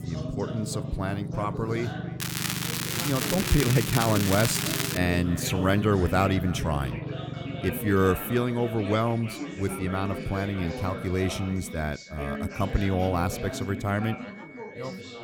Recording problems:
echo of what is said; faint; throughout; 320 ms later, 20 dB below the speech
background chatter; loud; throughout; 4 voices, 10 dB below the speech
crackling; loud; from 2 to 5 s; 2 dB below the speech
low rumble; noticeable; throughout; 15 dB below the speech
high-pitched whine; faint; from 7.5 s on; 2 kHz, 20 dB below the speech

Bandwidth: 19 kHz